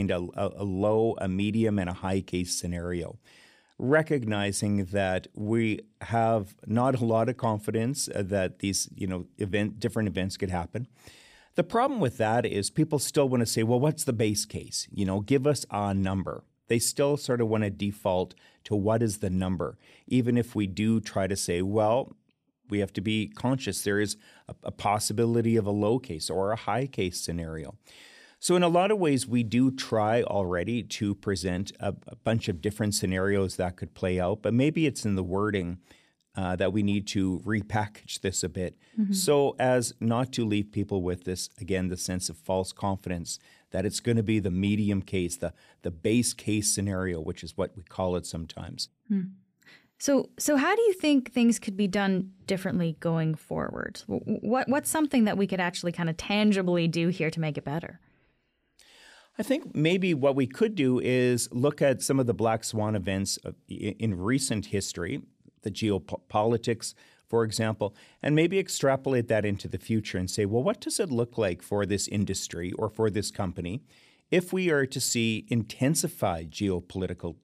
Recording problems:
abrupt cut into speech; at the start

